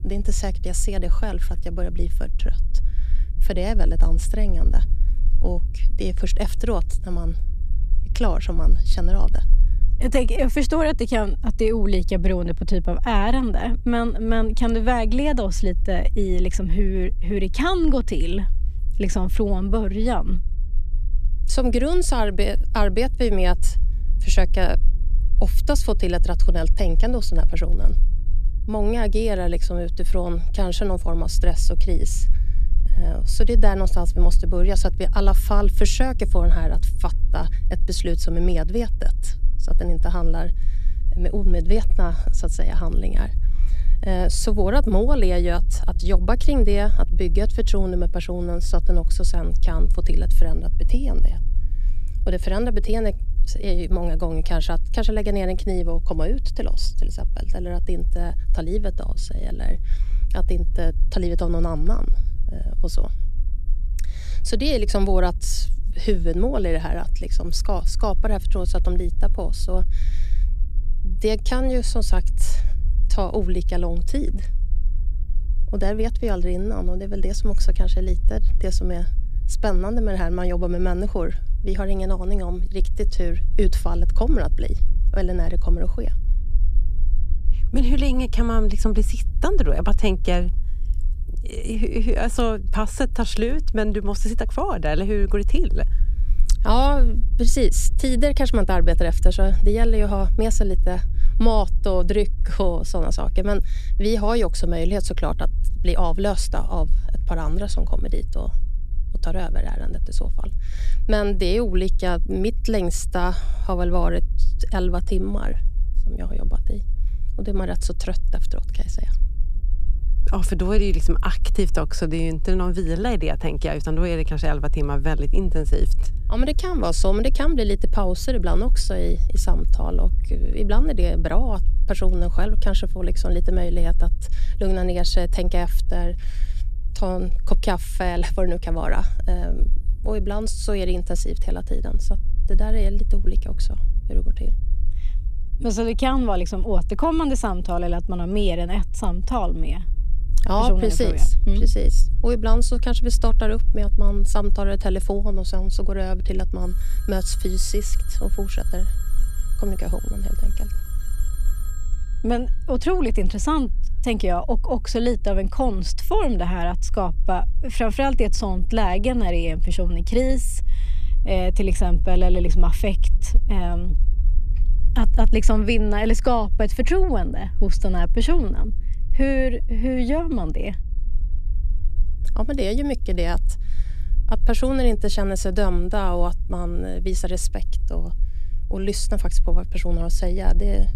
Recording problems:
low rumble; faint; throughout; 20 dB below the speech
phone ringing; faint; from 2:37 to 2:42; peak 15 dB below the speech

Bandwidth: 14 kHz